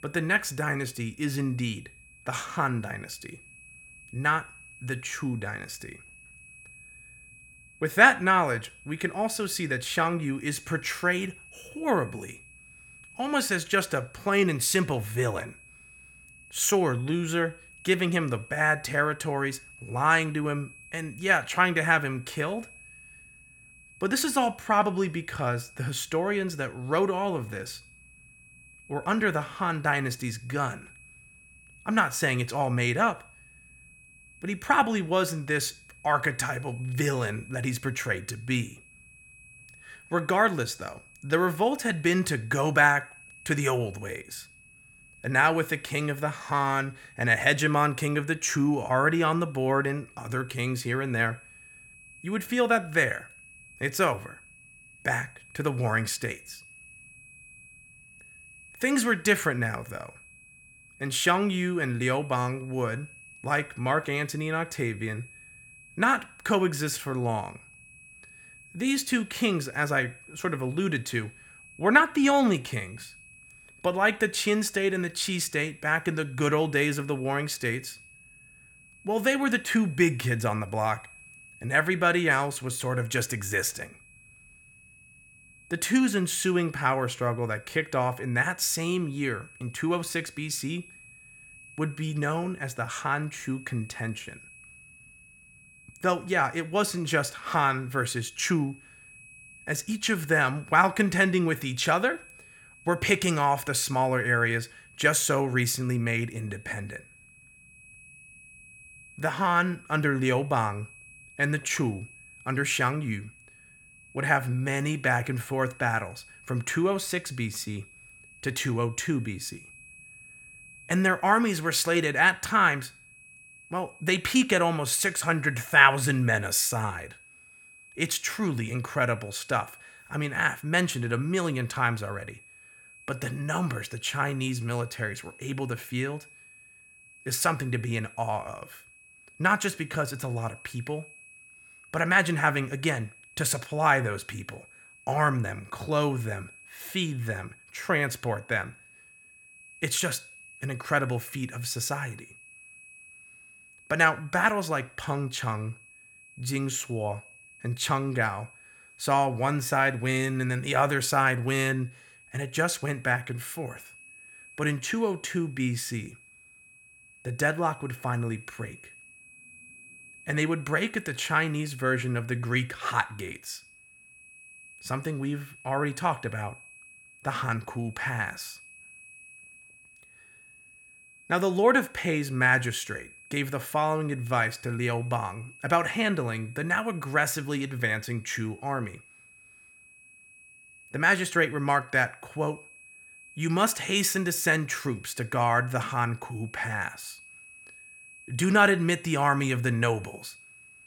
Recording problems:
high-pitched whine; faint; throughout; 2.5 kHz, 25 dB below the speech

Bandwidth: 17.5 kHz